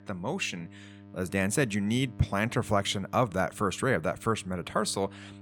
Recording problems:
electrical hum; faint; throughout; 50 Hz, 25 dB below the speech

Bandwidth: 17.5 kHz